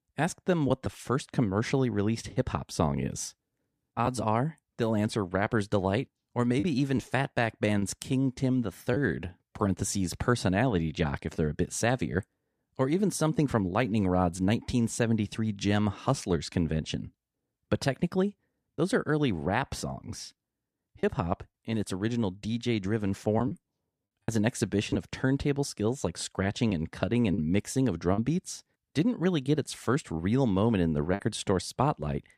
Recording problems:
choppy; occasionally; 2% of the speech affected

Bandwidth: 14.5 kHz